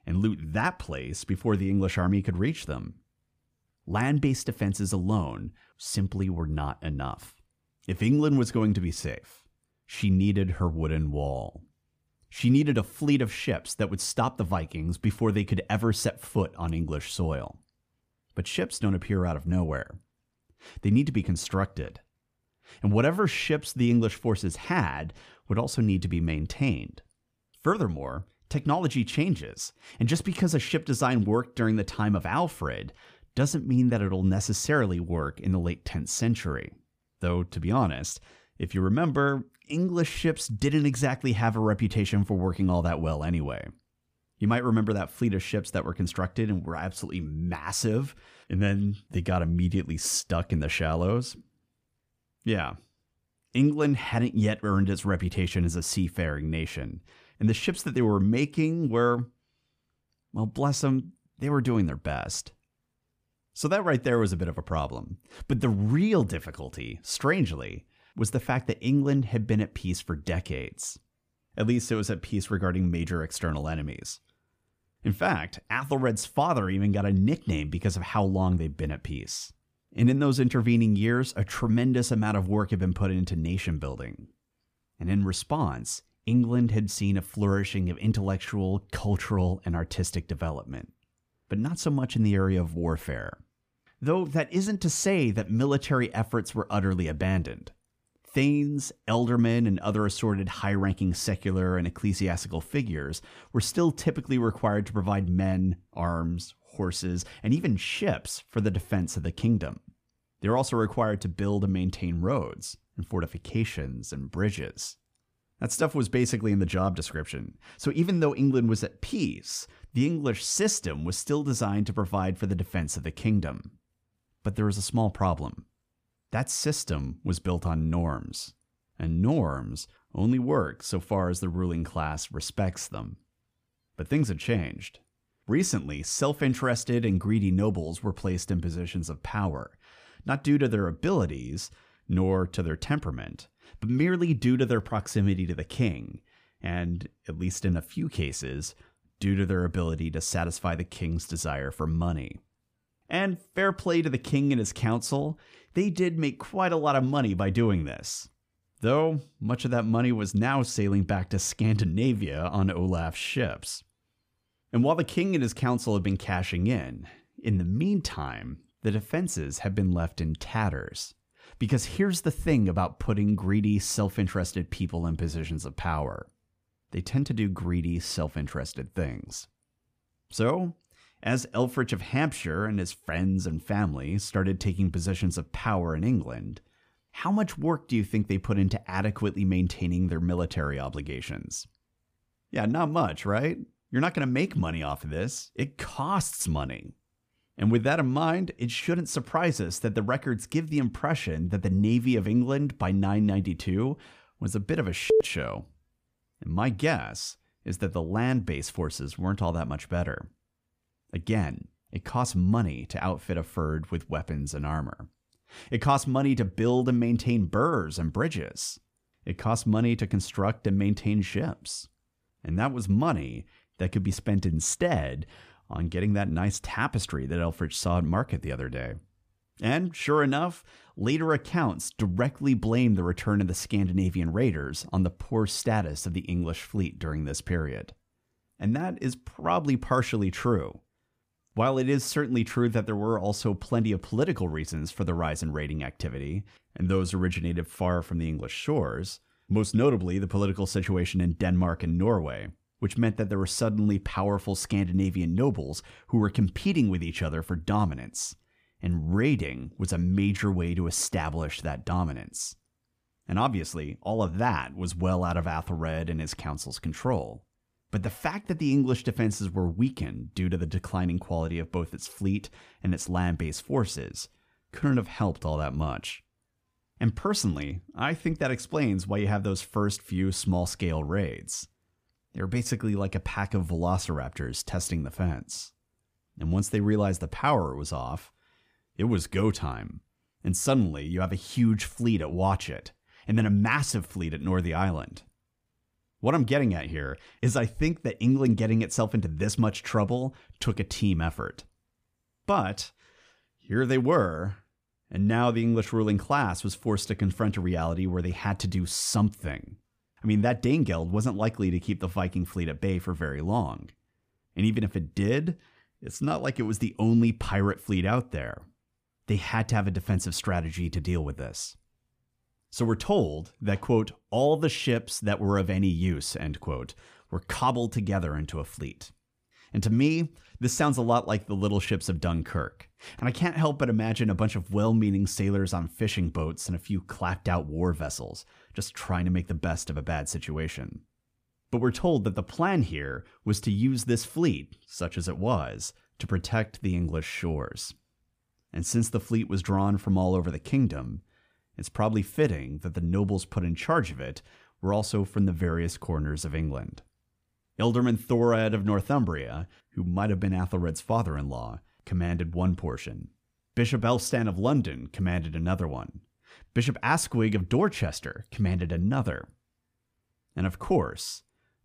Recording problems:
none

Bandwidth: 15 kHz